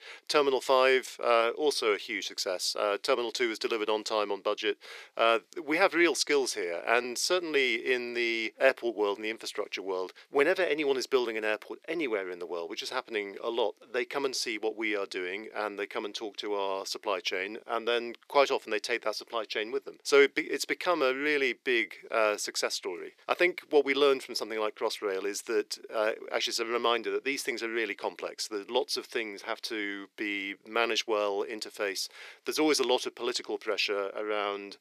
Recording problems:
thin; very; fading below 400 Hz

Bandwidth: 14.5 kHz